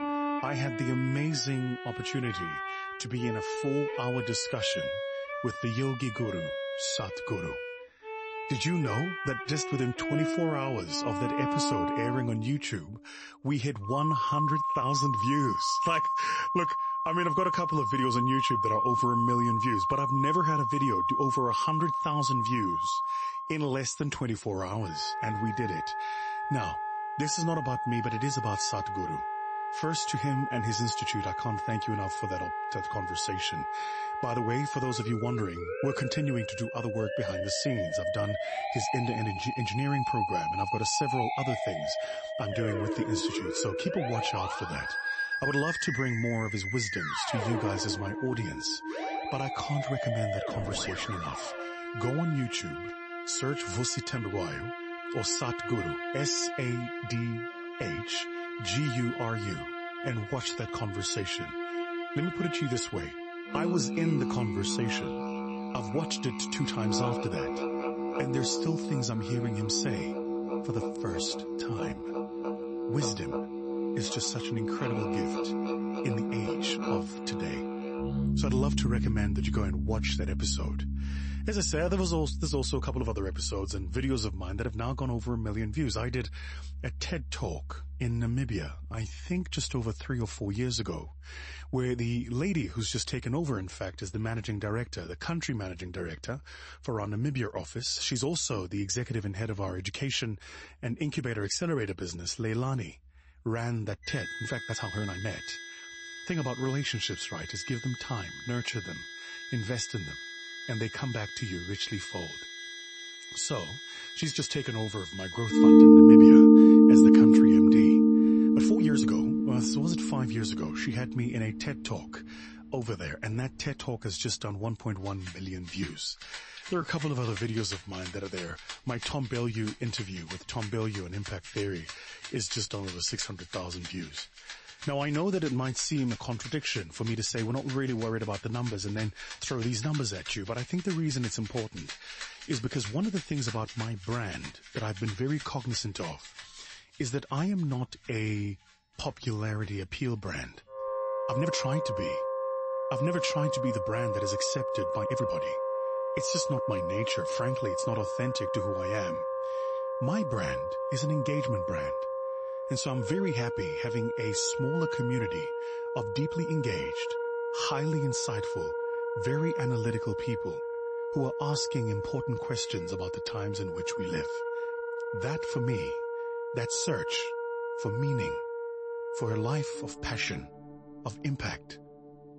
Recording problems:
garbled, watery; slightly; nothing above 8 kHz
background music; very loud; throughout; 4 dB above the speech
uneven, jittery; strongly; from 9 s to 2:47

